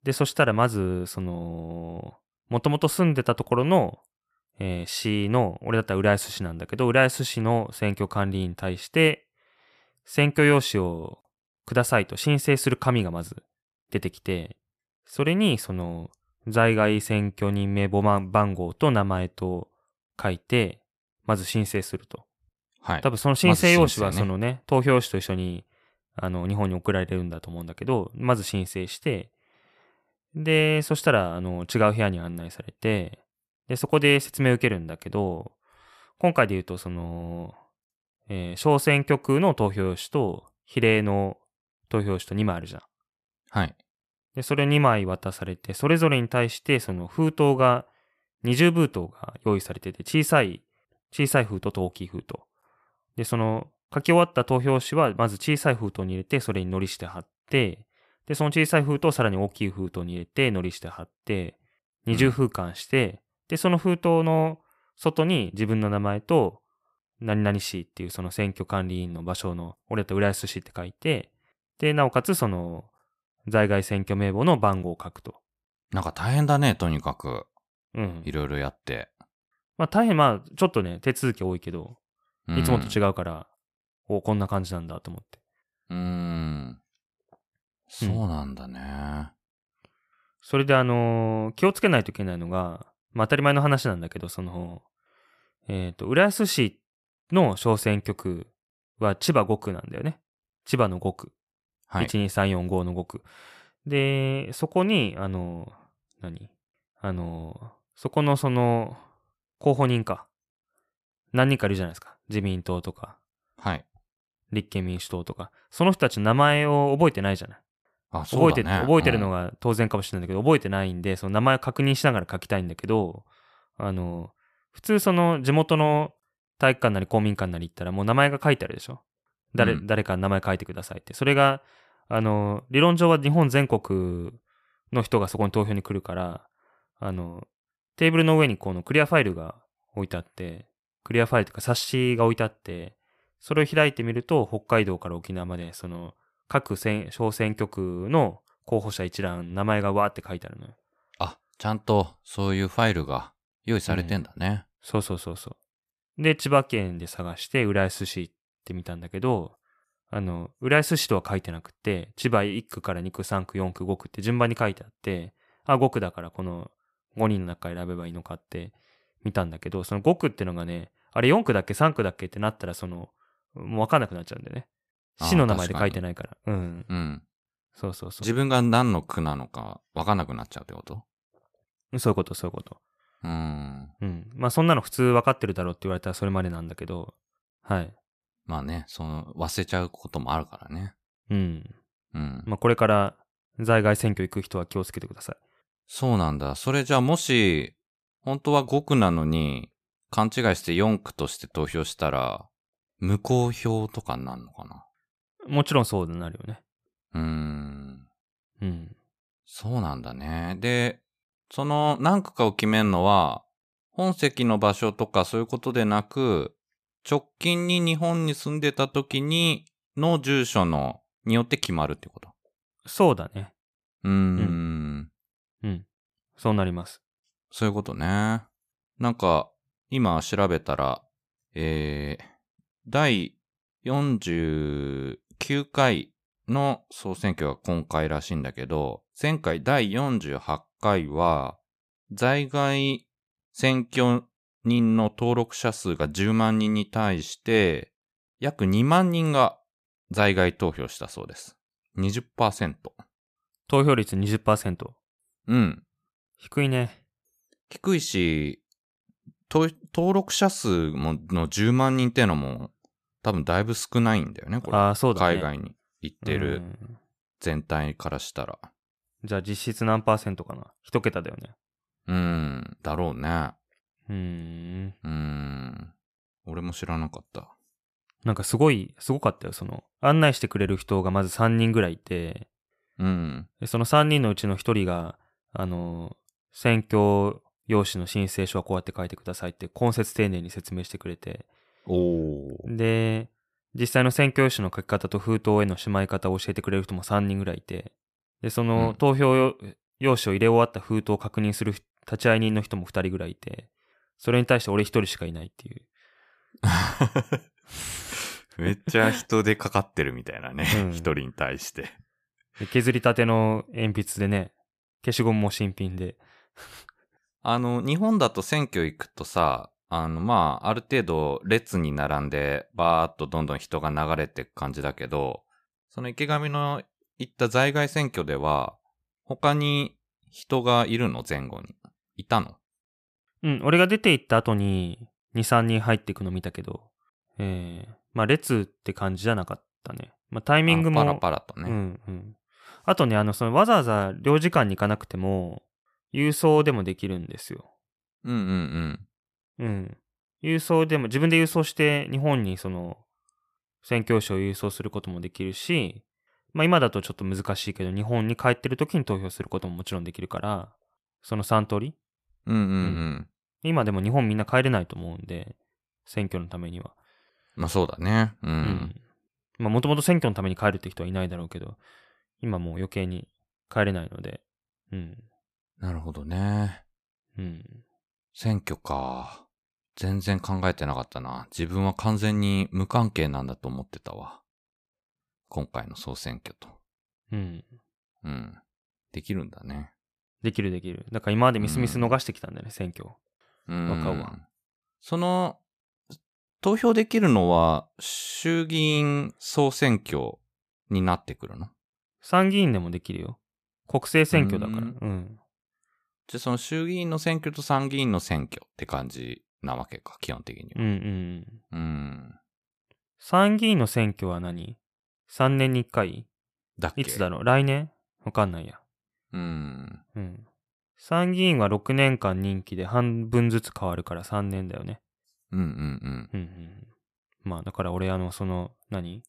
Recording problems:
none

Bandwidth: 14.5 kHz